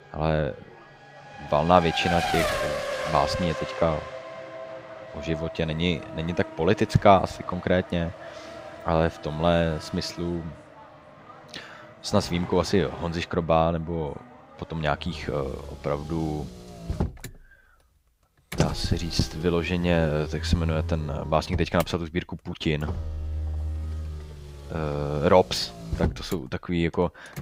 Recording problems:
traffic noise; loud; throughout; 9 dB below the speech

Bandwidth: 15.5 kHz